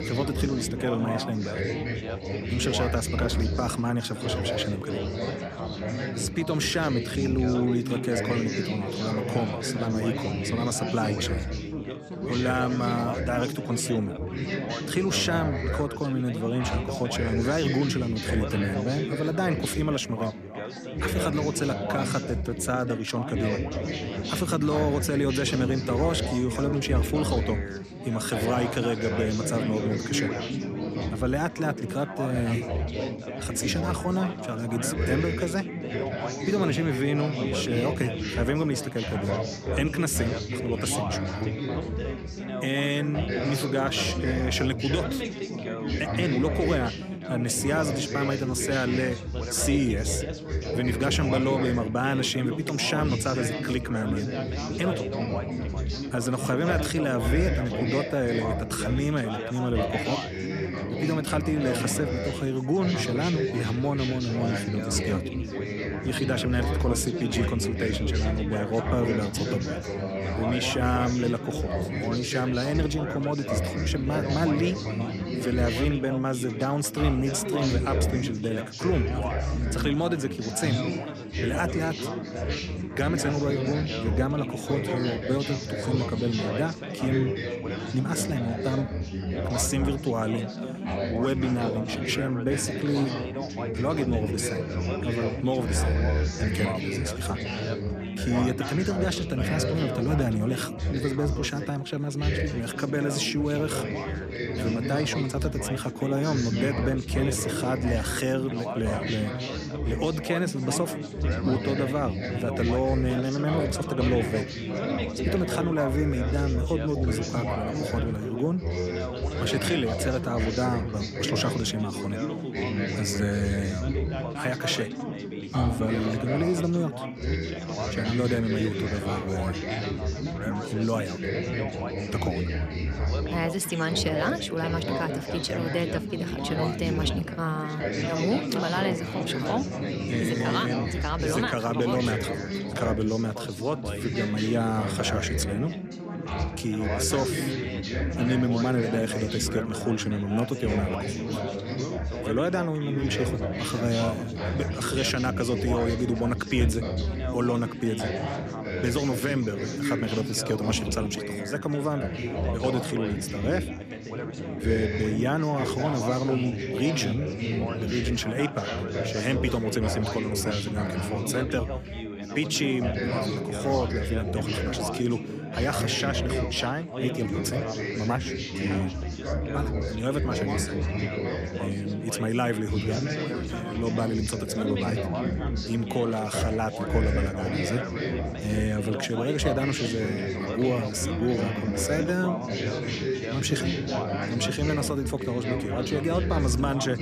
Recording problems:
chatter from many people; loud; throughout; 2 dB below the speech

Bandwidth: 14.5 kHz